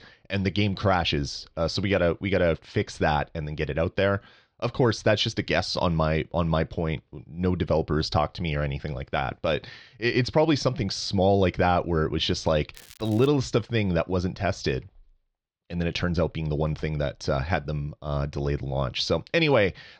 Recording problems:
muffled; slightly; fading above 4.5 kHz
crackling; faint; at 13 s; 25 dB below the speech

